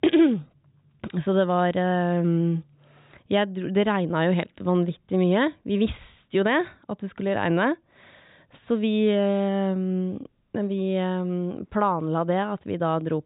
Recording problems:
high frequencies cut off; severe; nothing above 4 kHz

